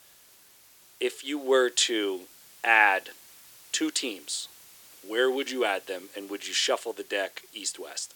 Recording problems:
thin; very; fading below 350 Hz
hiss; faint; throughout; 25 dB below the speech

